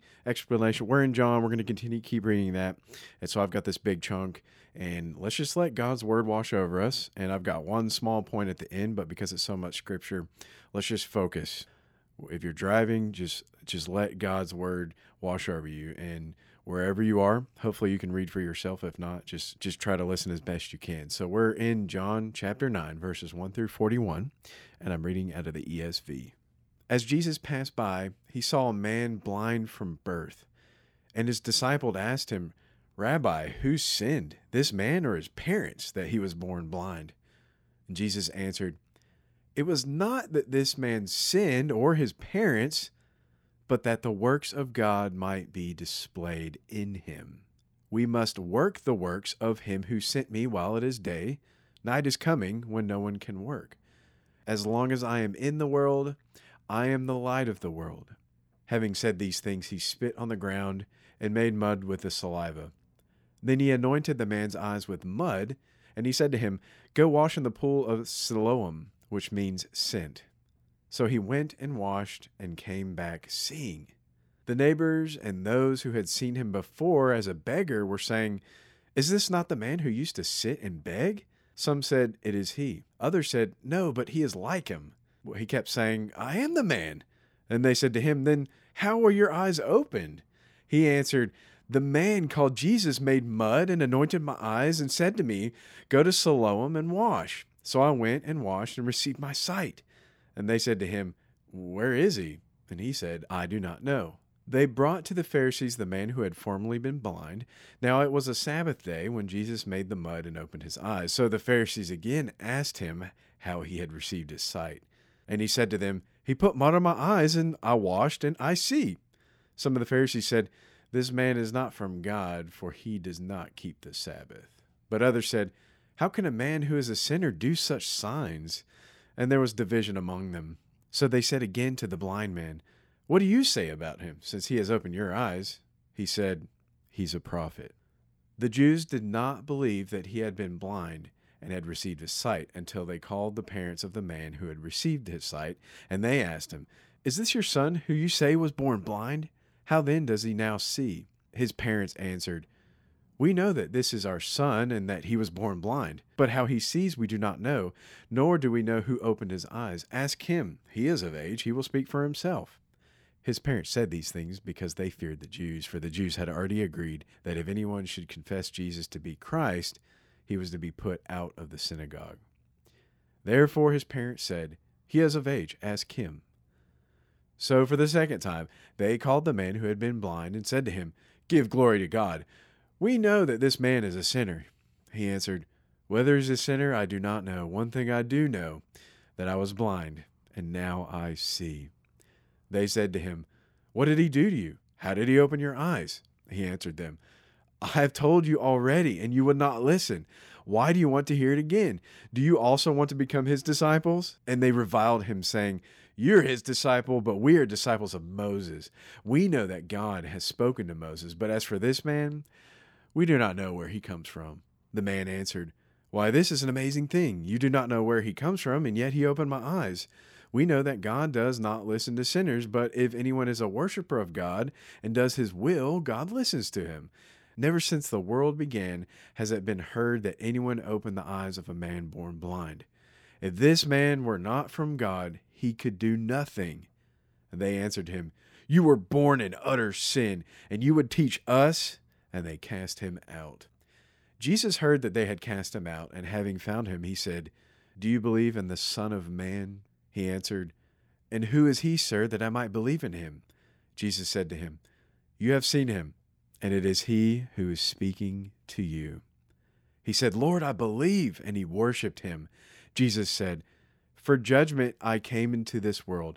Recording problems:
none

